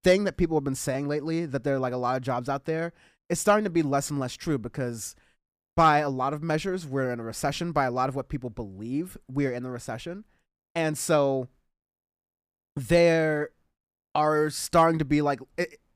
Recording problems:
none

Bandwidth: 15 kHz